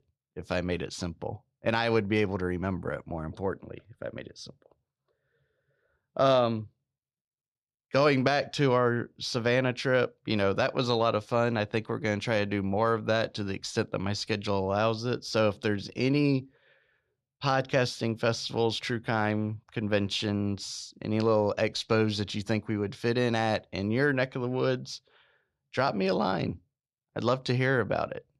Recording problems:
none

